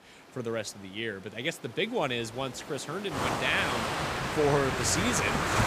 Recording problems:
rain or running water; very loud; throughout; as loud as the speech

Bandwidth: 15 kHz